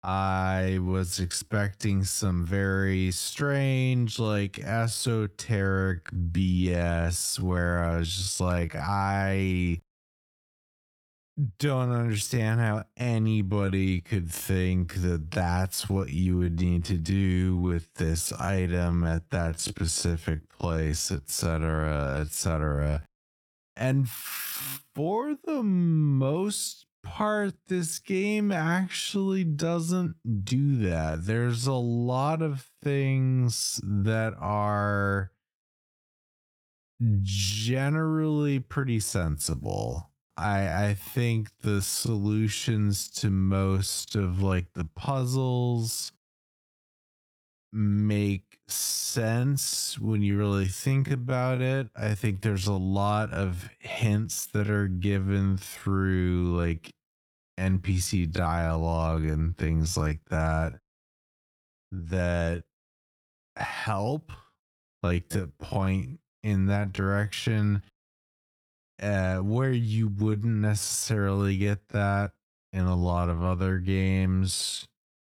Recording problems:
wrong speed, natural pitch; too slow; 0.6 times normal speed

